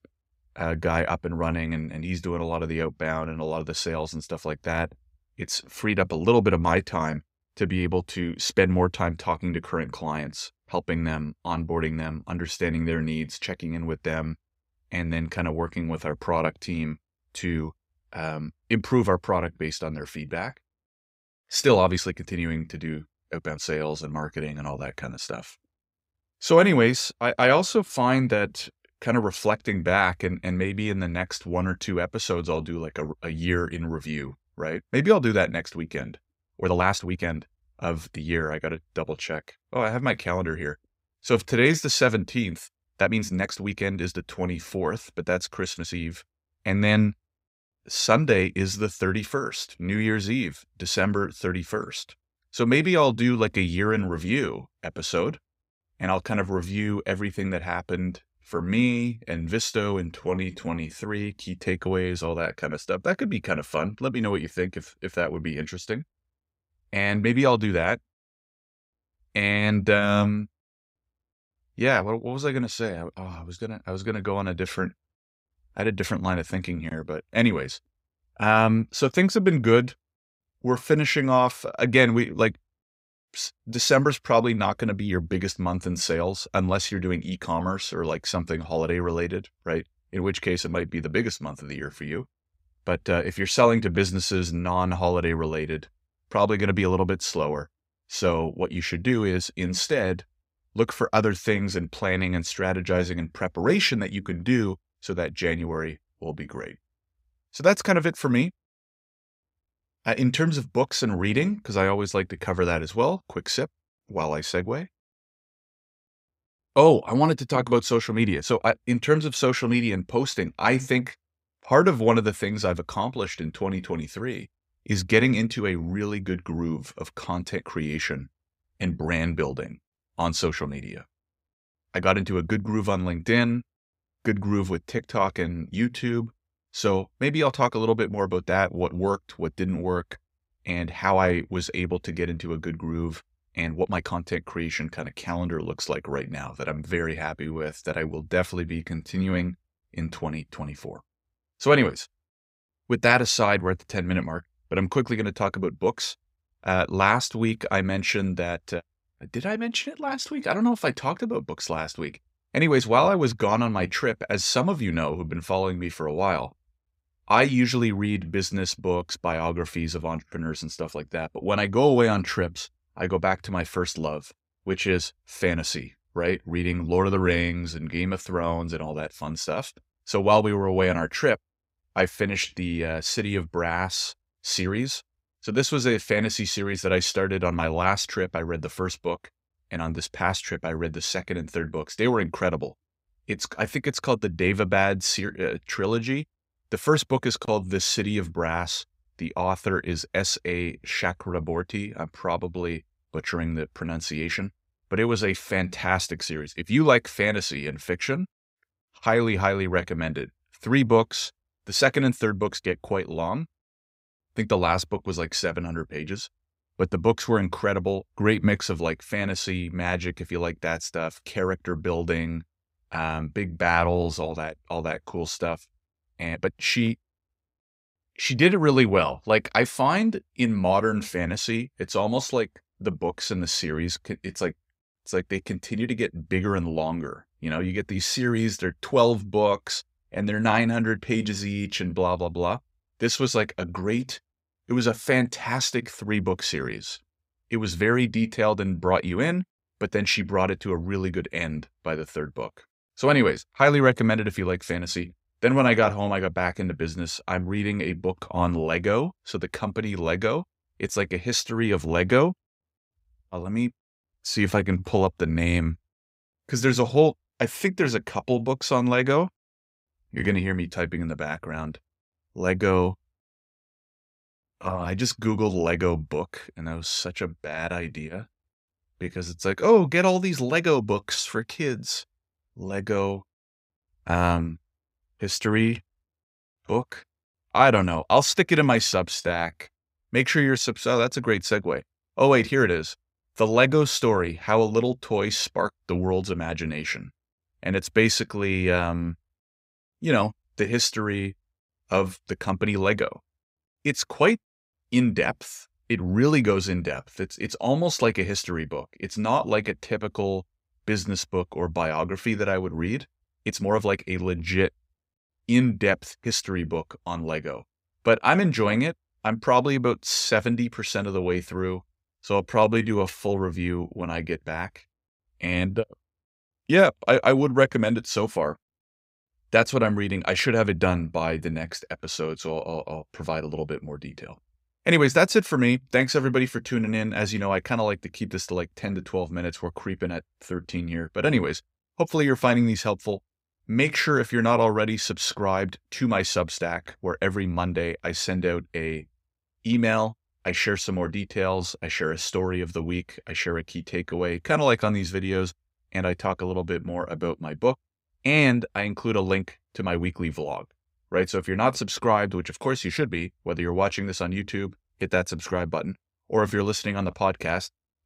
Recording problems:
uneven, jittery; strongly; from 21 s to 5:23

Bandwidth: 15.5 kHz